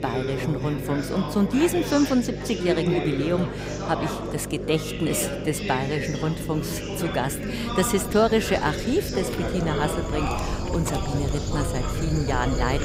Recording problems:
animal sounds; loud; throughout; 8 dB below the speech
background chatter; loud; throughout; 4 voices, 5 dB below the speech
electrical hum; noticeable; throughout; 50 Hz, 10 dB below the speech
wind in the background; faint; throughout; 25 dB below the speech

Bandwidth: 15.5 kHz